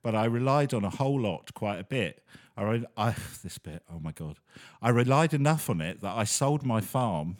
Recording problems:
none

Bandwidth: 18.5 kHz